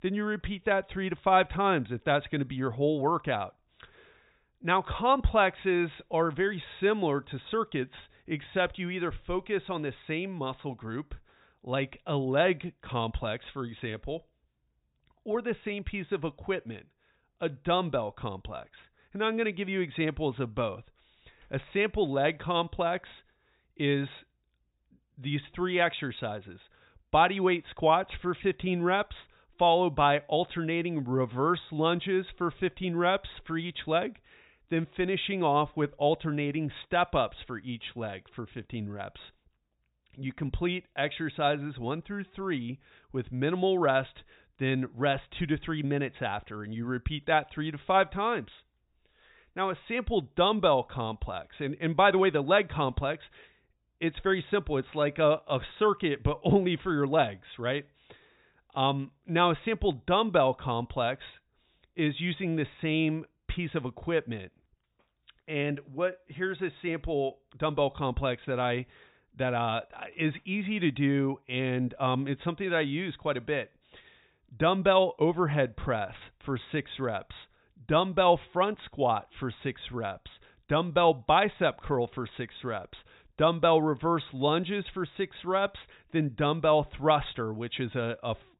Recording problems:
high frequencies cut off; severe; nothing above 4 kHz

